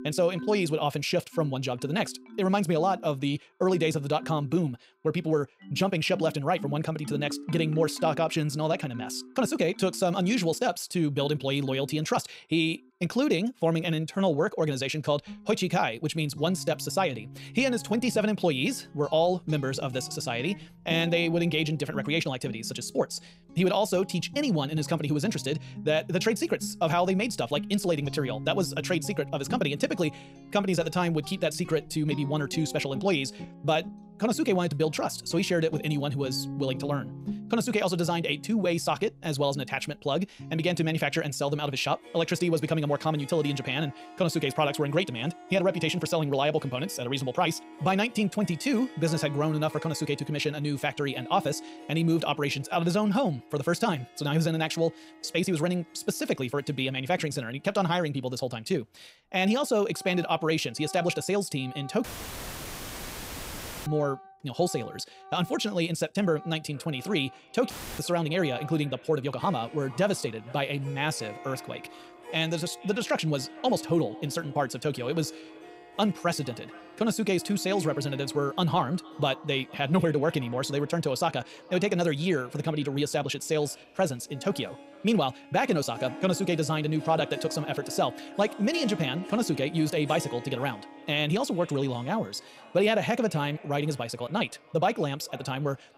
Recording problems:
wrong speed, natural pitch; too fast; 1.6 times normal speed
echo of what is said; faint; from 1:07 on; 460 ms later, 25 dB below the speech
background music; noticeable; throughout; 15 dB below the speech
uneven, jittery; strongly; from 9.5 s to 1:14
audio cutting out; filled with static; at 1:02 for 2 s and at 1:08

